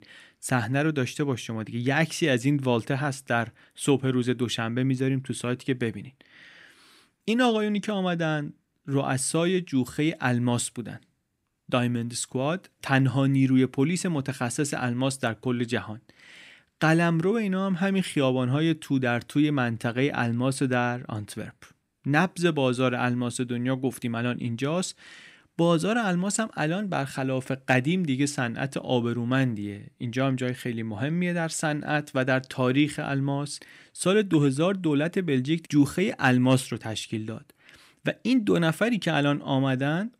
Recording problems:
none

